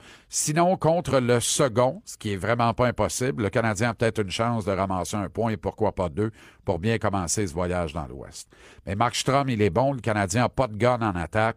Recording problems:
none

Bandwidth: 15 kHz